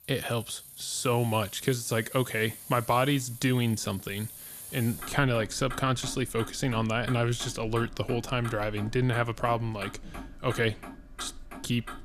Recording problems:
traffic noise; noticeable; throughout; 15 dB below the speech

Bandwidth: 14.5 kHz